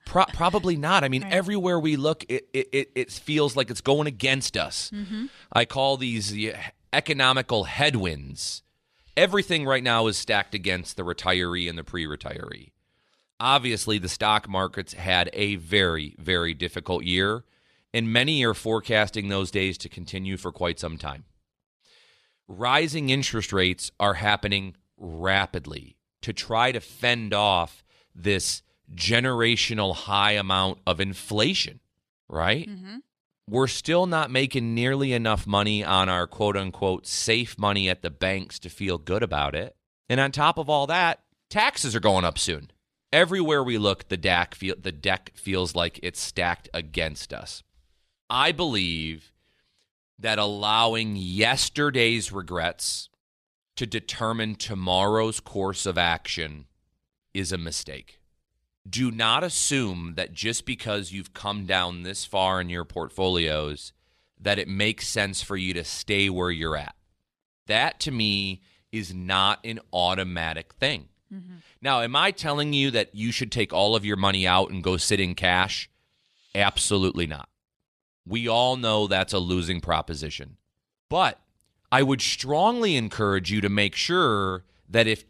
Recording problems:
none

